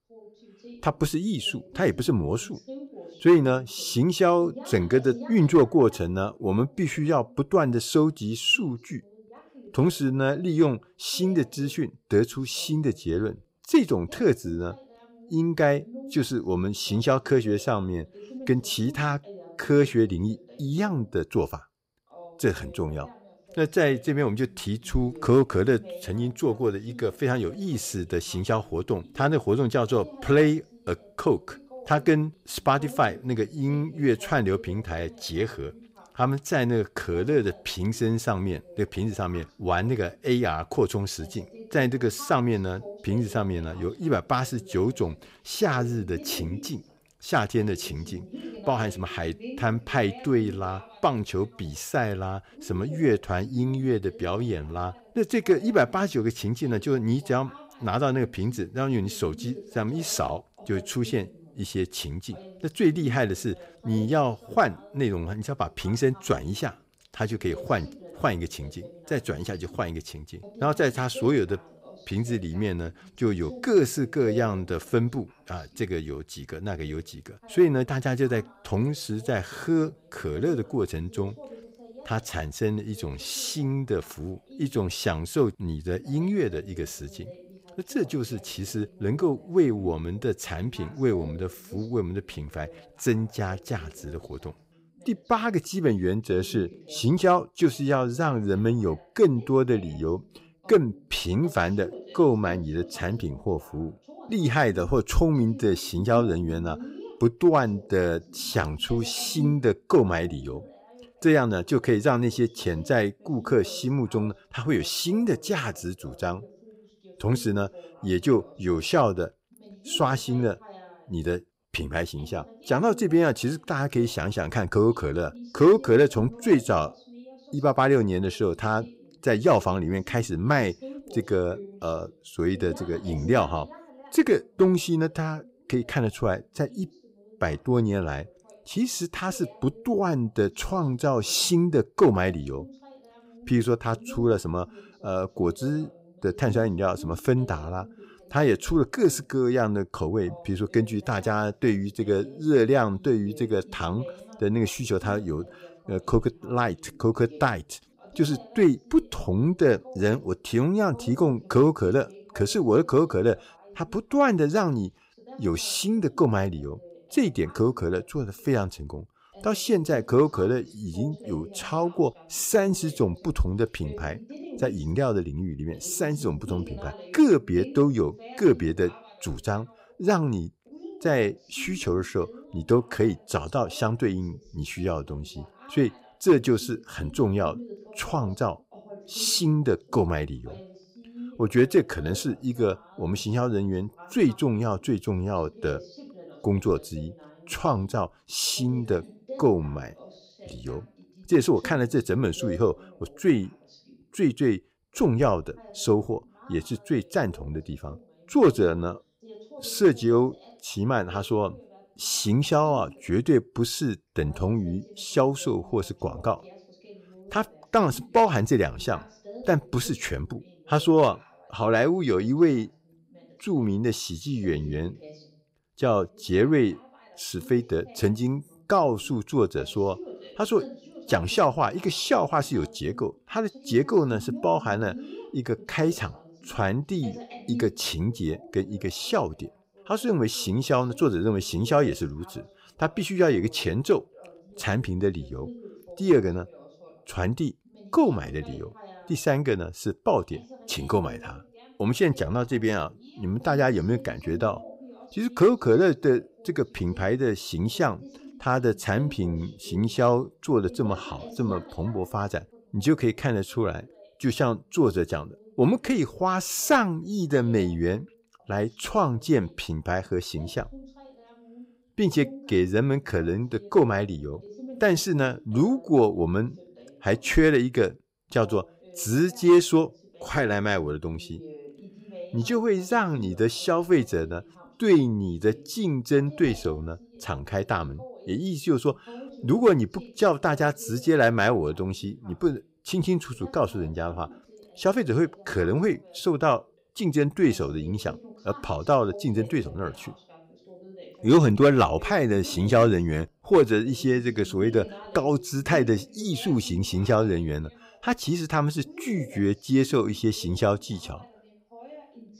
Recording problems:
voice in the background; faint; throughout; 20 dB below the speech

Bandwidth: 15.5 kHz